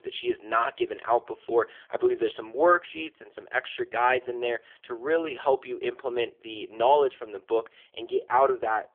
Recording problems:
phone-call audio; poor line; nothing above 3.5 kHz

